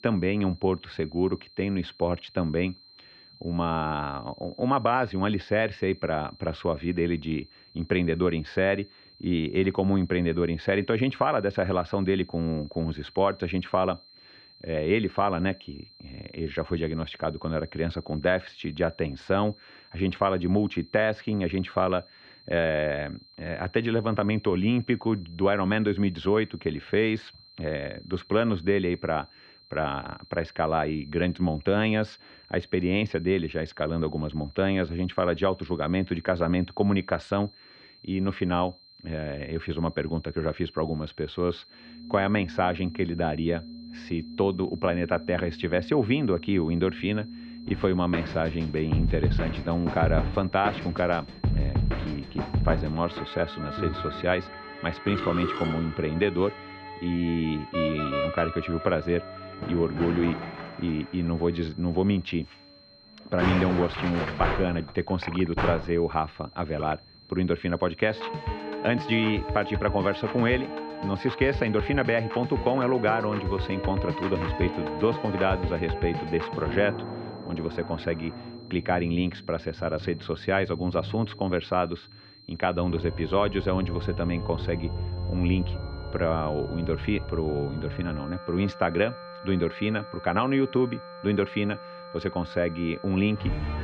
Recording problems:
muffled; very; fading above 2.5 kHz
background music; loud; from 42 s on; 7 dB below the speech
high-pitched whine; faint; throughout; 4 kHz, 25 dB below the speech

